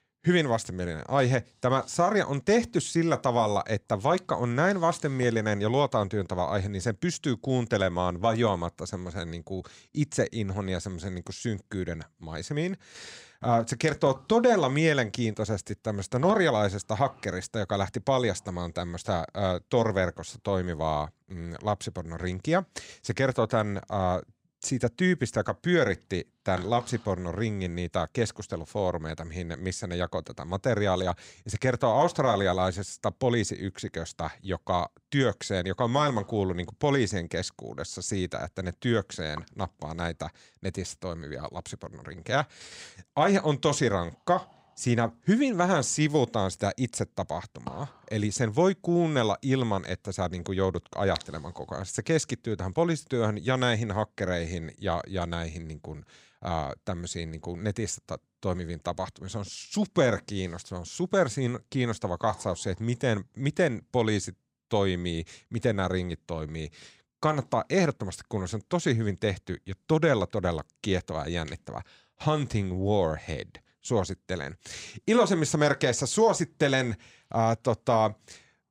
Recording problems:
none

